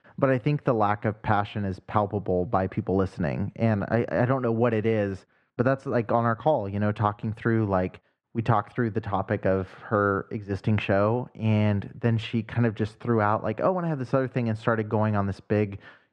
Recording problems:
muffled; slightly; fading above 2.5 kHz

